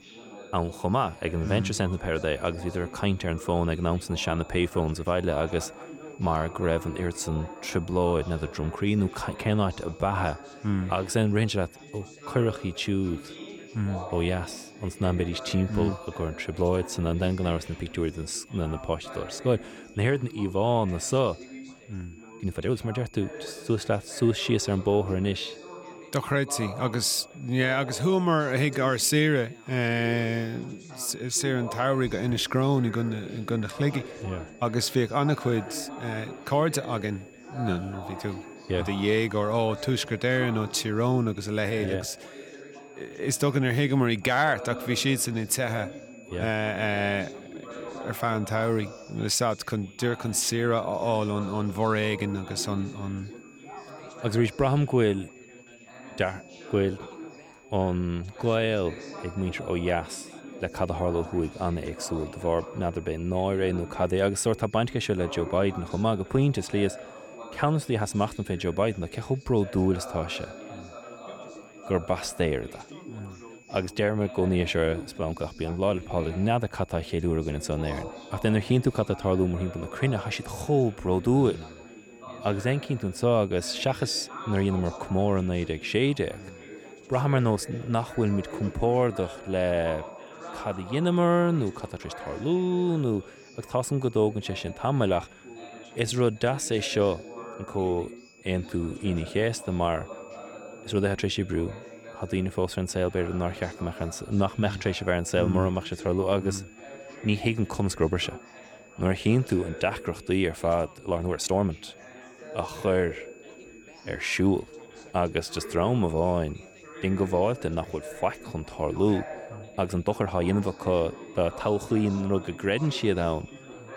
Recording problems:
background chatter; noticeable; throughout; 4 voices, 15 dB below the speech
high-pitched whine; faint; throughout; 2.5 kHz, 25 dB below the speech
uneven, jittery; strongly; from 4.5 s to 2:01

